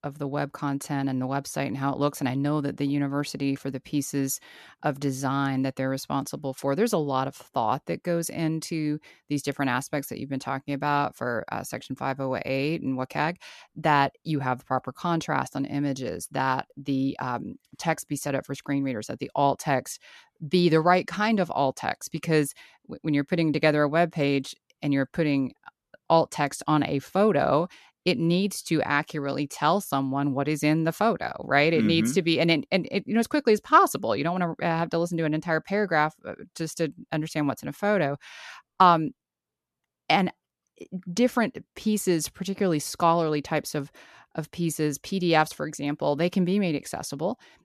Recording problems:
none

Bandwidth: 13.5 kHz